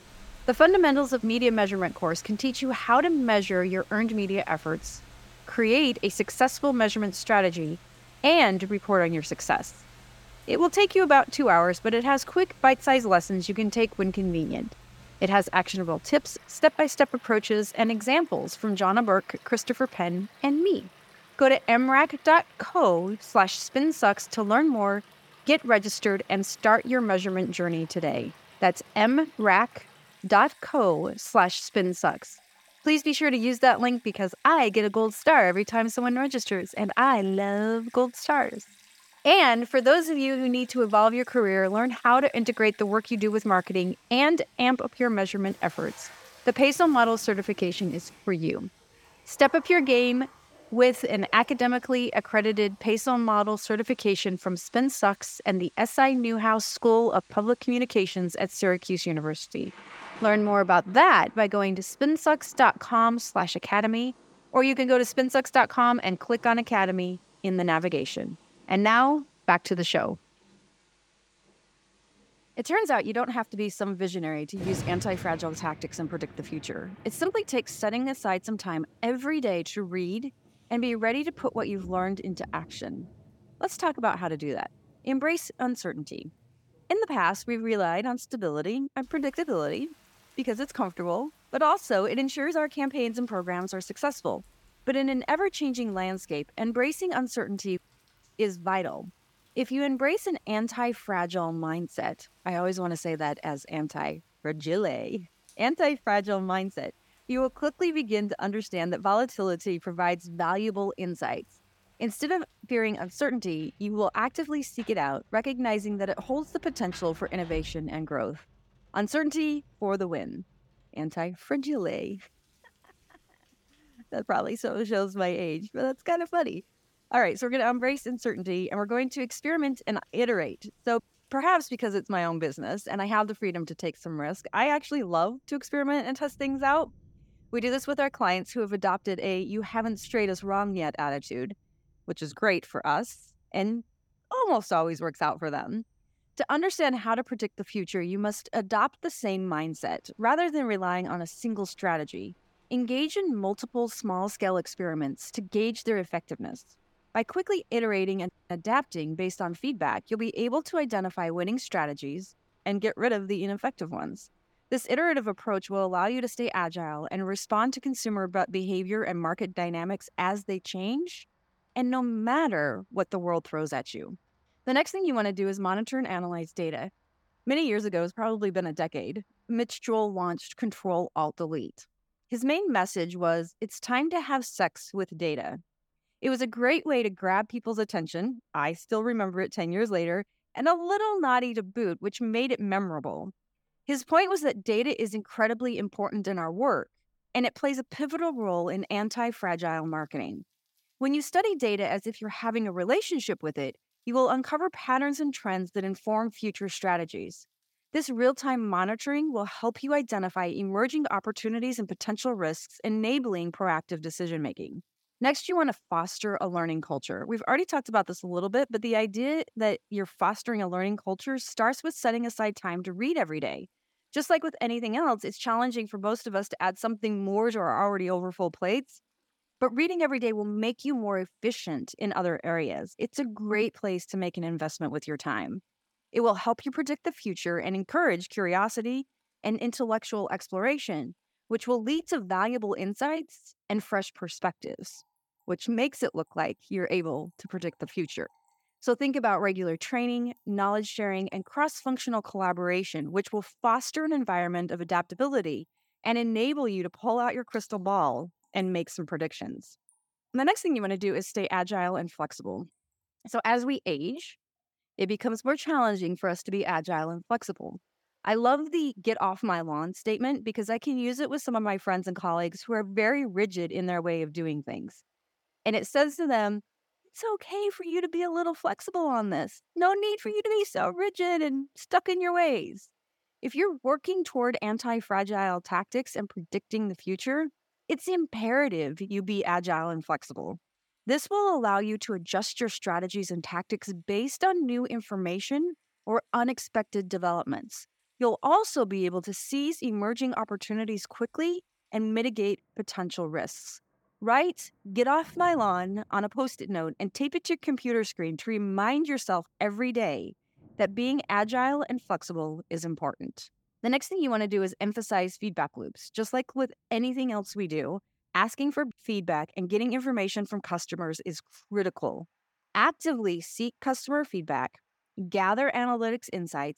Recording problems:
rain or running water; faint; throughout; 25 dB below the speech

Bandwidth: 17.5 kHz